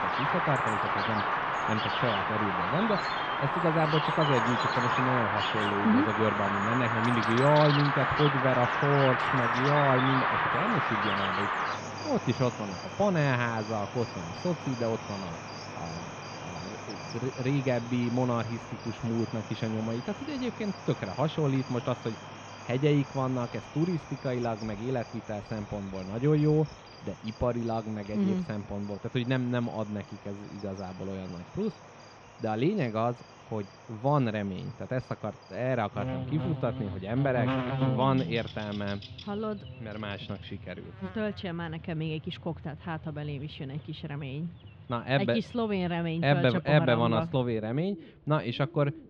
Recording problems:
muffled; slightly; fading above 3.5 kHz
animal sounds; loud; throughout; 1 dB below the speech

